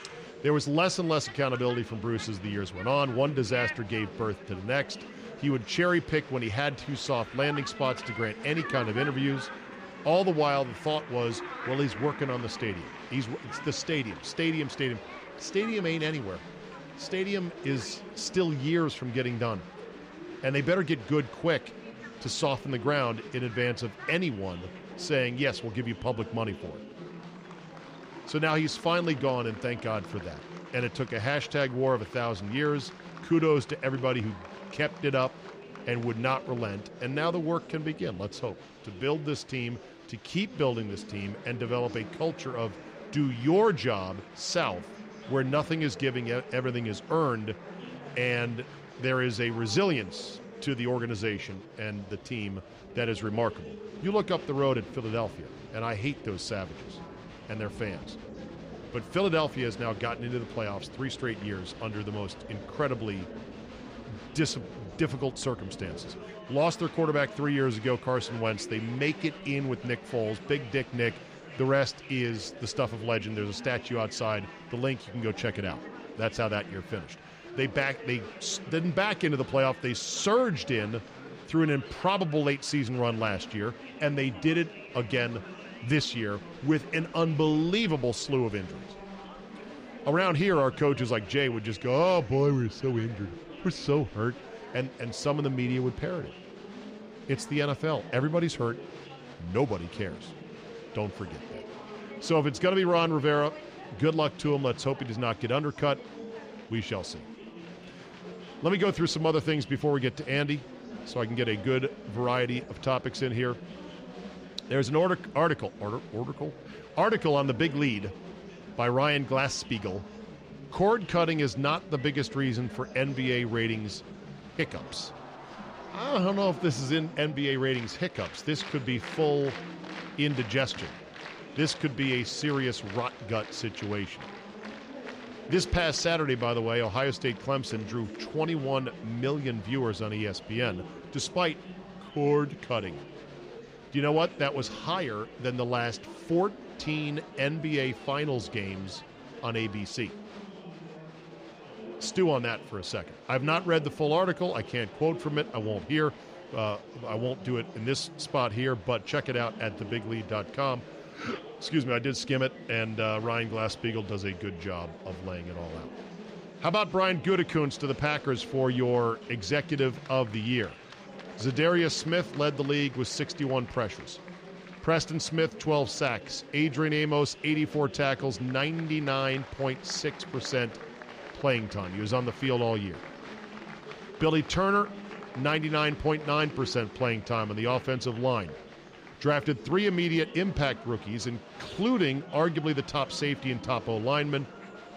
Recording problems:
murmuring crowd; noticeable; throughout; 15 dB below the speech

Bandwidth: 15 kHz